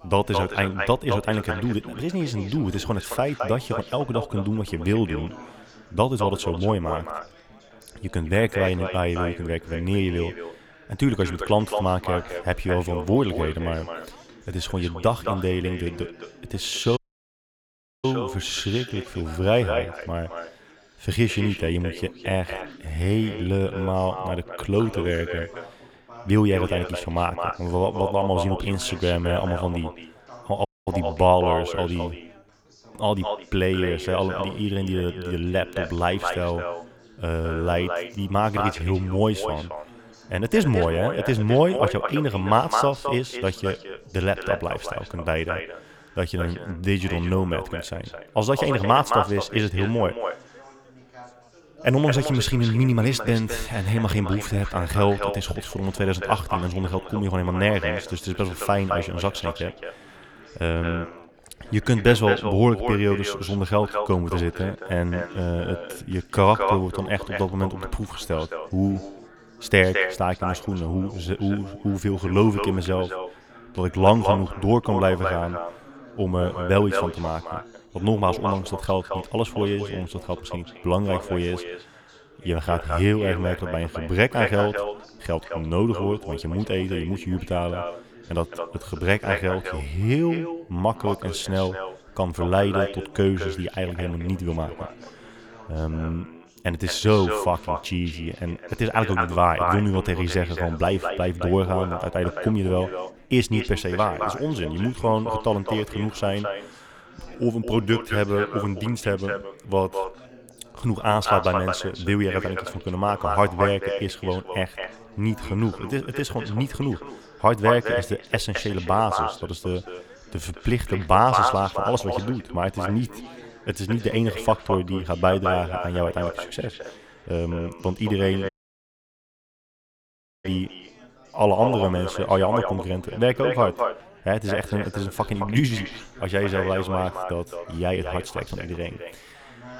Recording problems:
echo of what is said; strong; throughout; 220 ms later, 7 dB below the speech
background chatter; faint; throughout; 4 voices, 25 dB below the speech
audio cutting out; at 17 s for 1 s, at 31 s and at 2:08 for 2 s

